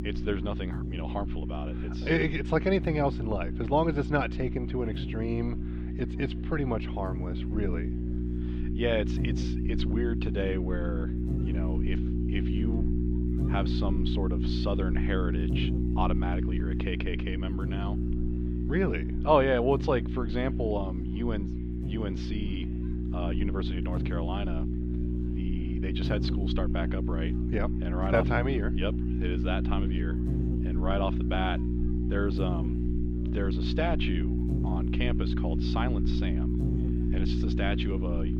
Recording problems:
muffled; slightly; fading above 3.5 kHz
electrical hum; loud; throughout; 60 Hz, 6 dB below the speech
murmuring crowd; faint; throughout; 30 dB below the speech

